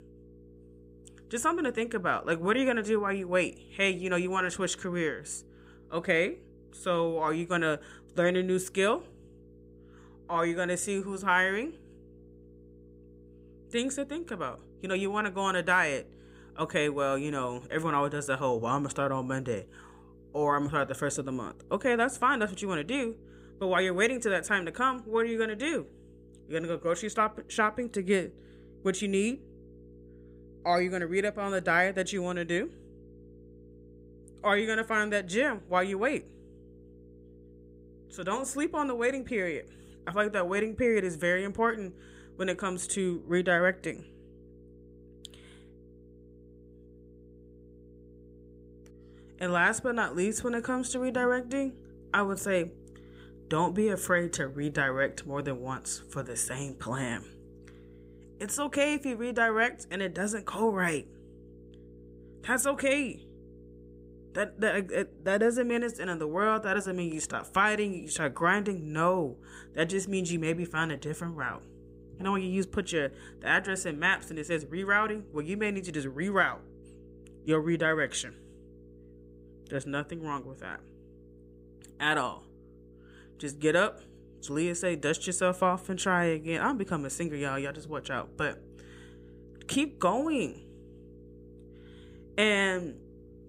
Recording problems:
electrical hum; faint; throughout; 60 Hz, 30 dB below the speech

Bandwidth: 15.5 kHz